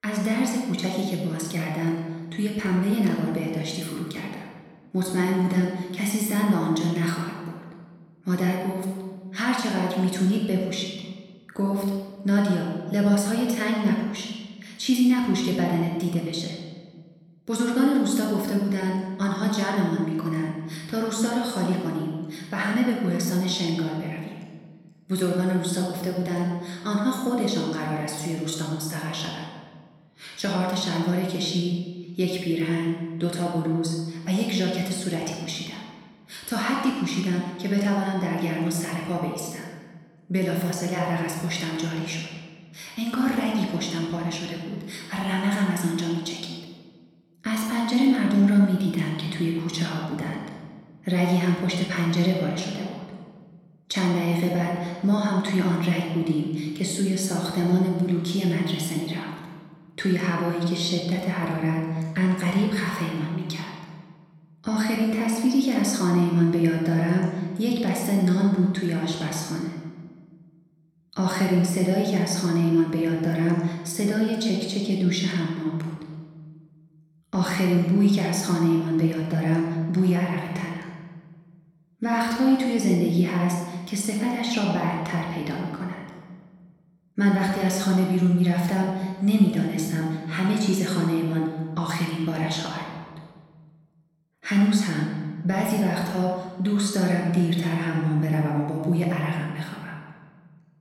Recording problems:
room echo; noticeable; dies away in 1.4 s
off-mic speech; somewhat distant

